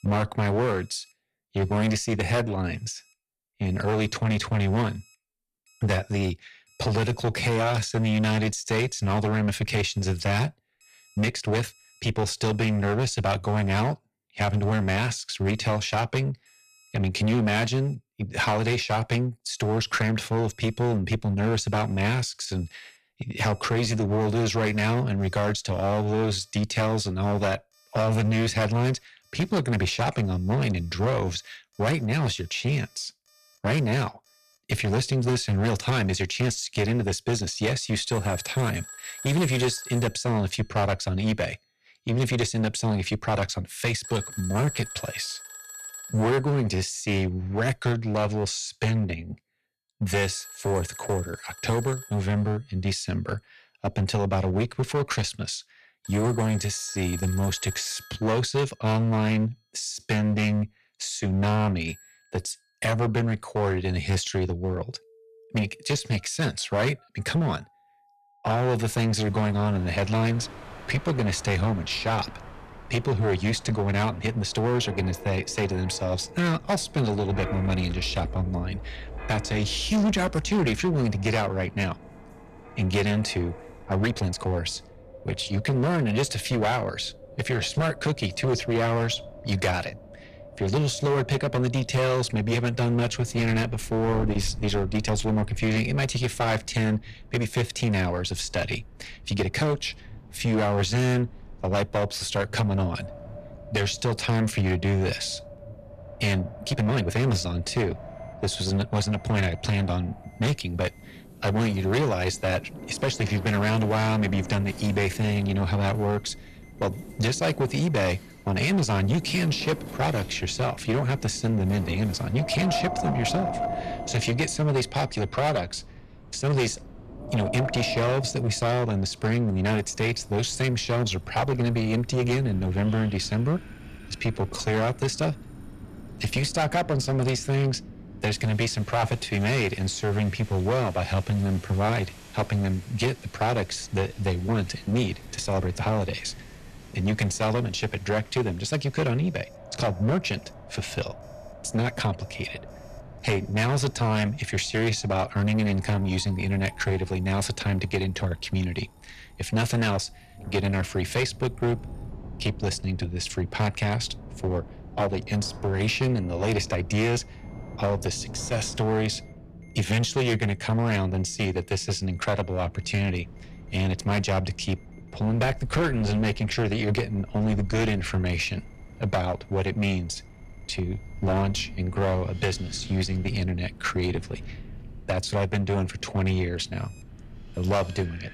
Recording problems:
distortion; heavy; 12% of the sound clipped
wind in the background; noticeable; from 1:09 on; 15 dB below the speech
alarms or sirens; faint; throughout; 20 dB below the speech
uneven, jittery; strongly; from 1.5 s to 2:34

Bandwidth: 14 kHz